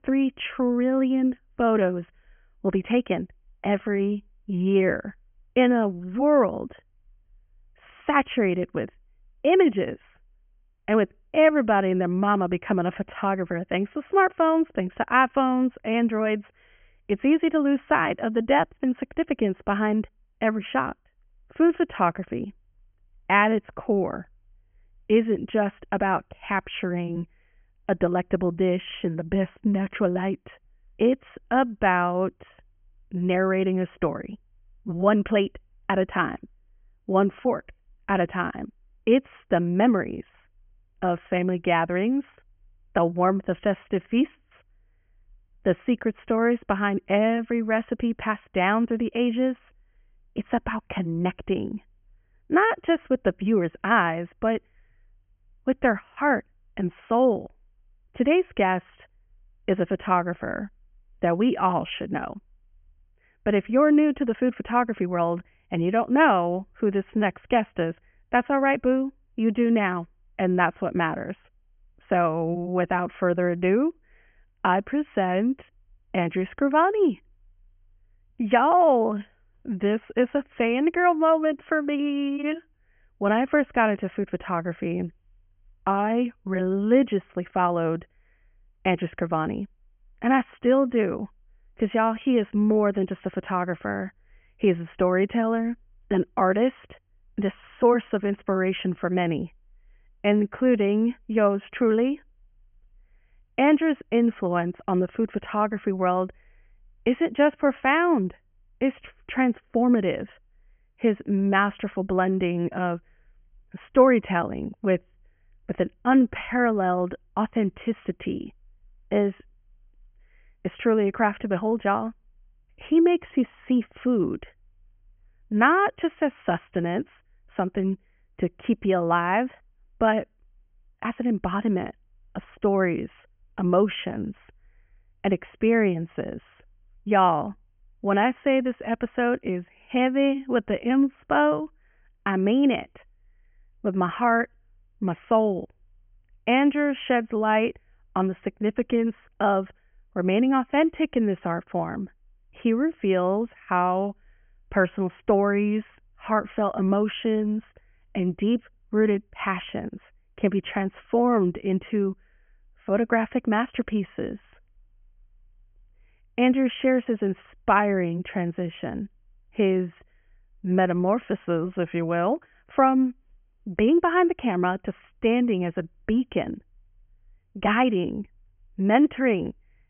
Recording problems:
high frequencies cut off; severe; nothing above 3 kHz

